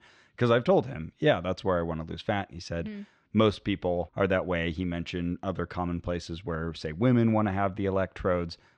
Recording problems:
muffled; slightly; fading above 4 kHz

